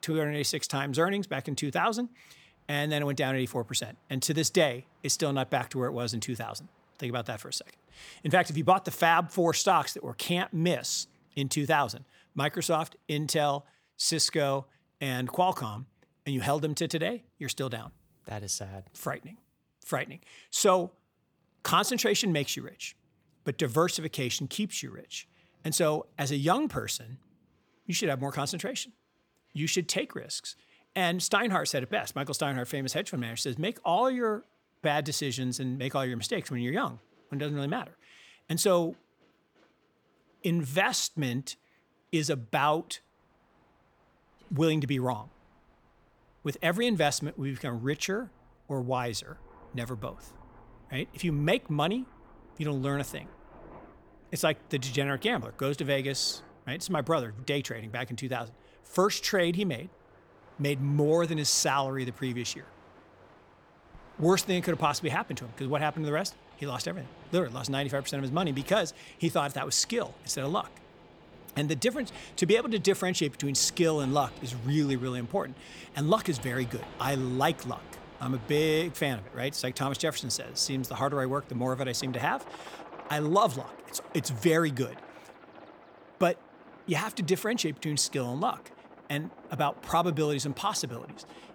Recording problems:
train or aircraft noise; faint; throughout; 20 dB below the speech

